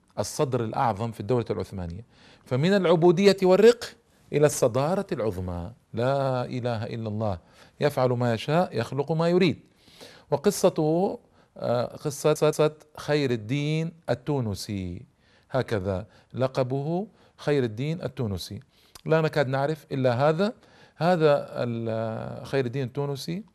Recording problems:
audio stuttering; at 12 s

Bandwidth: 13.5 kHz